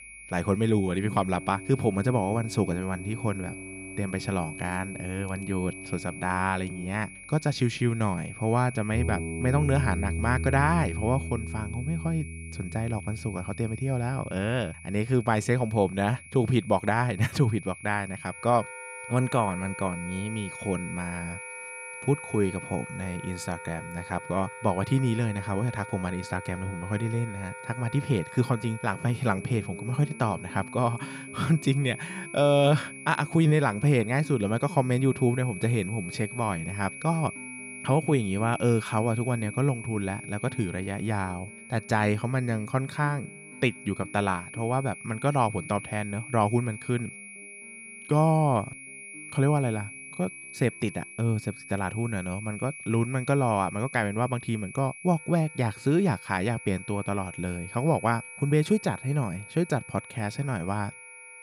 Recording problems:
high-pitched whine; noticeable; throughout; 2.5 kHz, 15 dB below the speech
background music; noticeable; throughout; 15 dB below the speech

